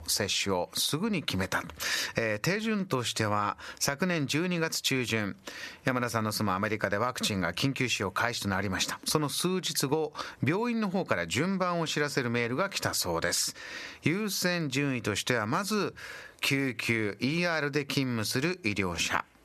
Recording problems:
squashed, flat; somewhat

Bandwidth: 13.5 kHz